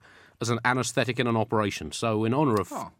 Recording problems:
none

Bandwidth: 16 kHz